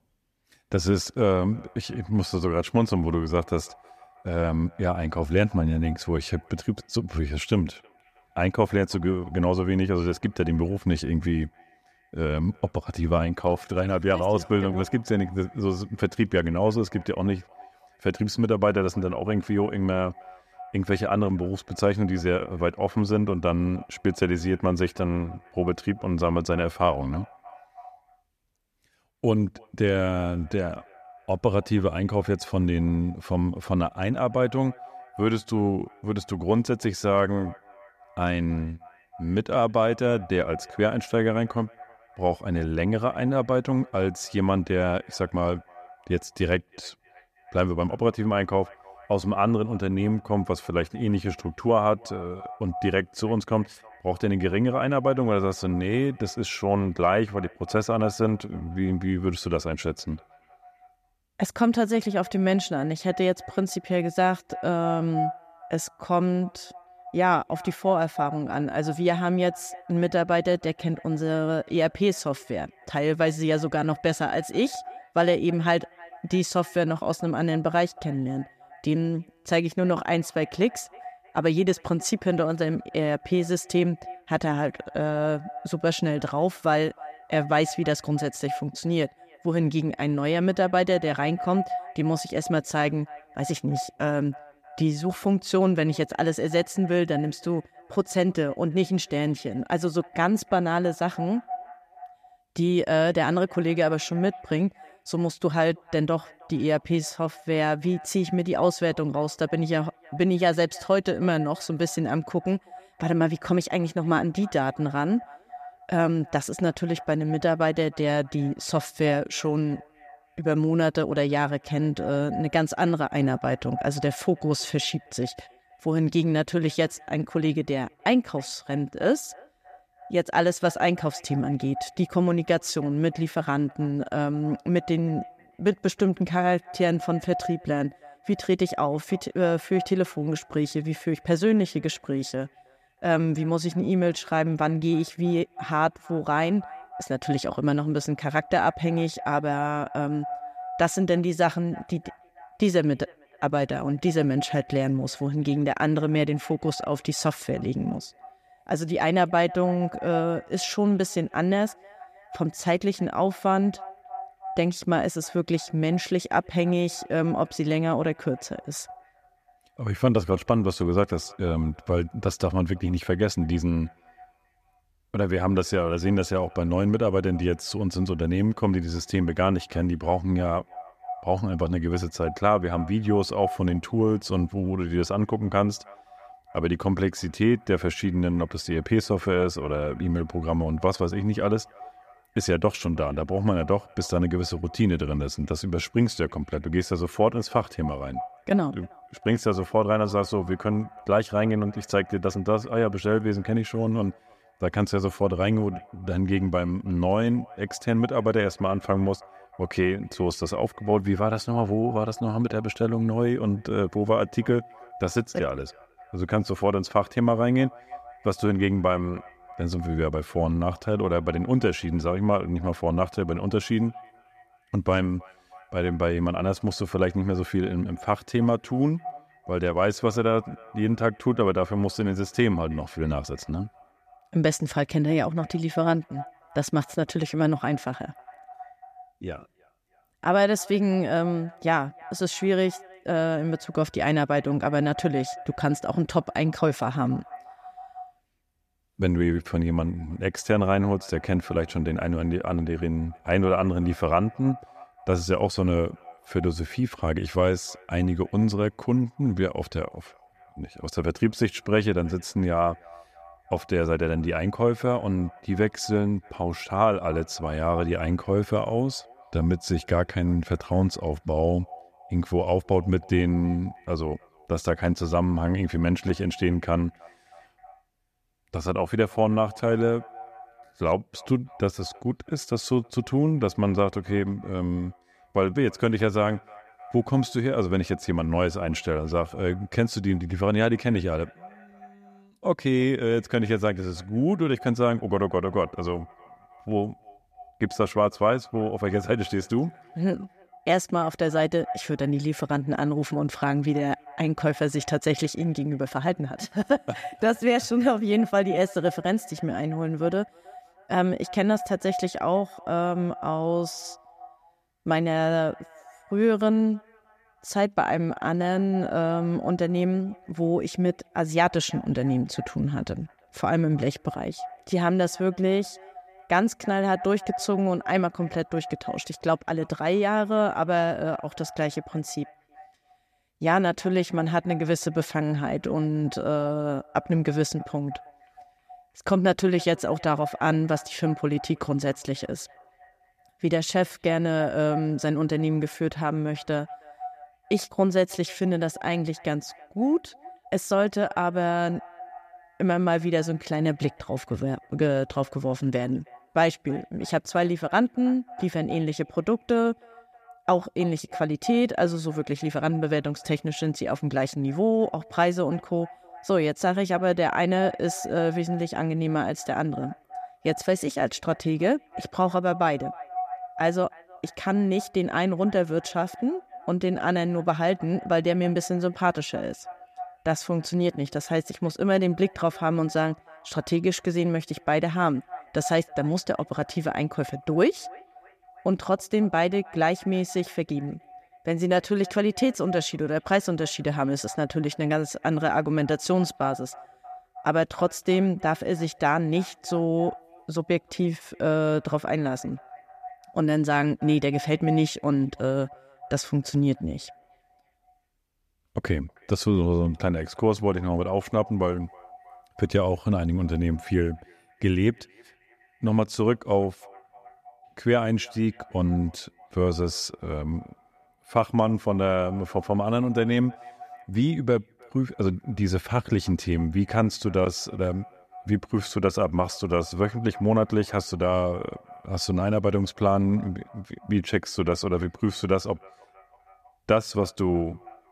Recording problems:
echo of what is said; faint; throughout; 320 ms later, 20 dB below the speech

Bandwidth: 14.5 kHz